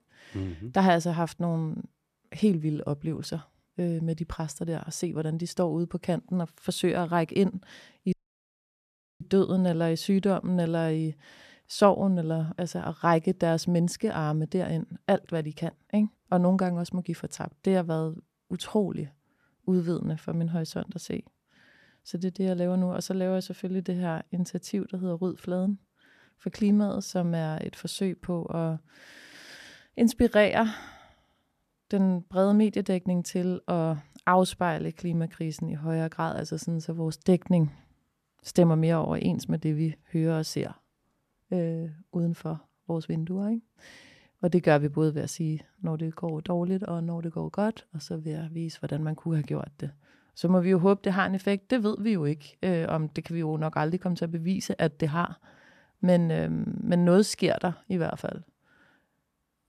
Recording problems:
audio cutting out; at 8 s for 1 s

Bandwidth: 14 kHz